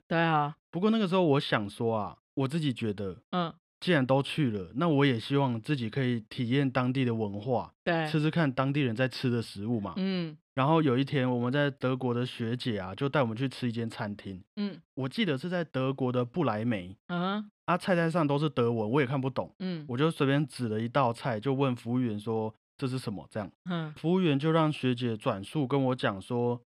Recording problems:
none

